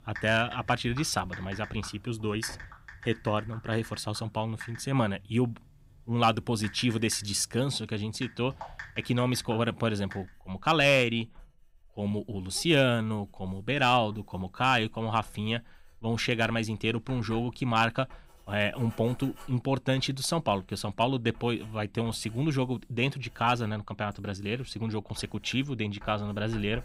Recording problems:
household noises; noticeable; throughout; 20 dB below the speech

